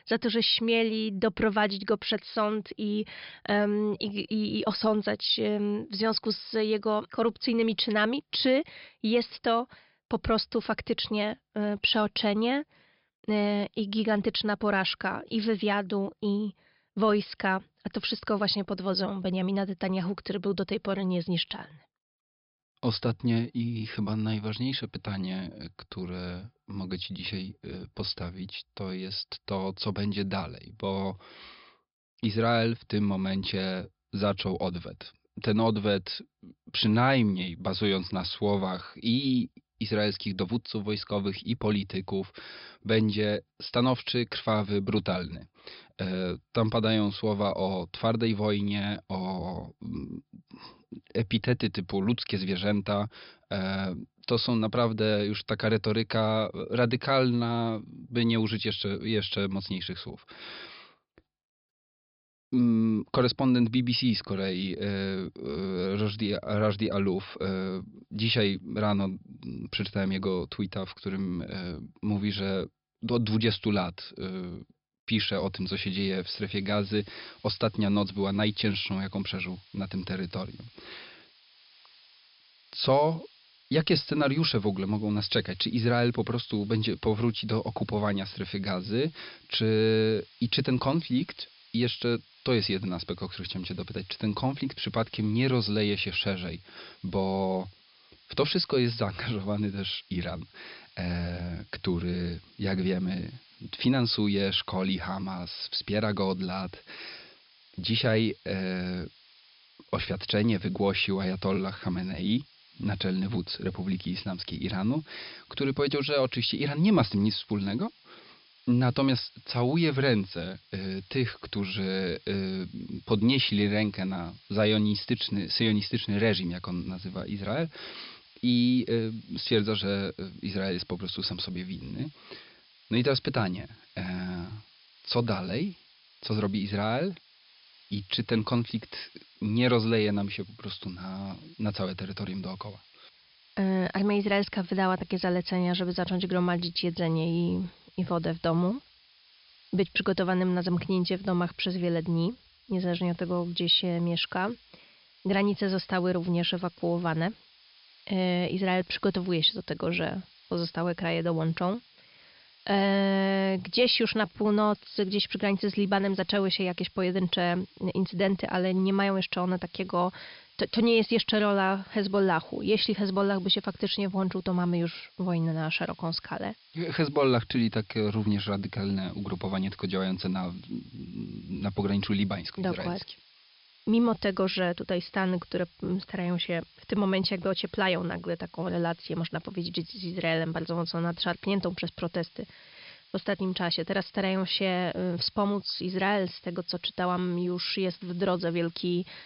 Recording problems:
high frequencies cut off; noticeable; nothing above 5.5 kHz
hiss; faint; from 1:16 on; 25 dB below the speech

